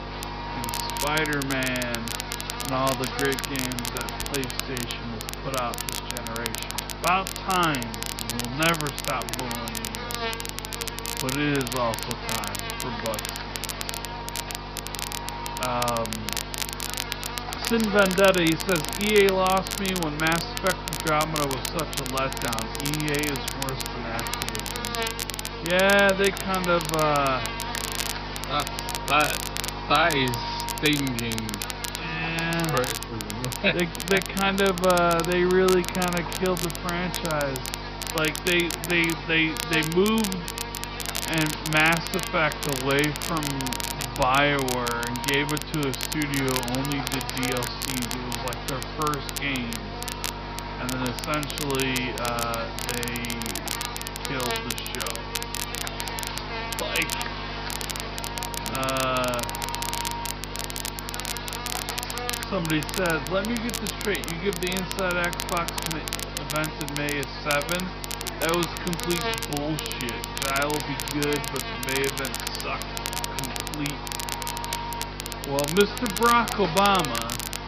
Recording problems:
wrong speed, natural pitch; too slow; 0.6 times normal speed
high frequencies cut off; noticeable; nothing above 5.5 kHz
electrical hum; loud; throughout; 50 Hz, 7 dB below the speech
crackle, like an old record; loud; 6 dB below the speech

